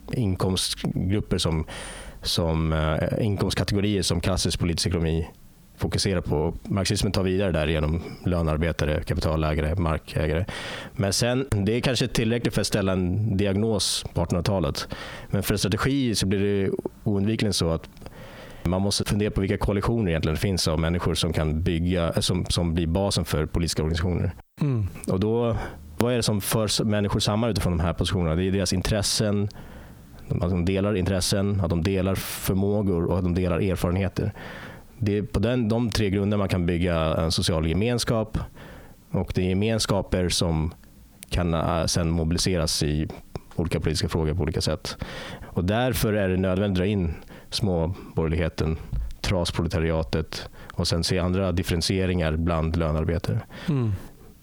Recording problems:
squashed, flat; heavily

